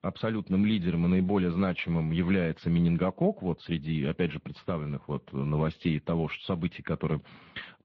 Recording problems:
muffled; very; fading above 3.5 kHz
garbled, watery; slightly

